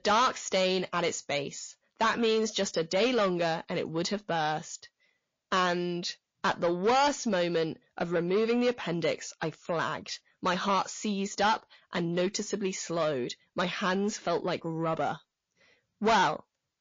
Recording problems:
distortion; heavy; 6 dB below the speech
garbled, watery; slightly; nothing above 6.5 kHz

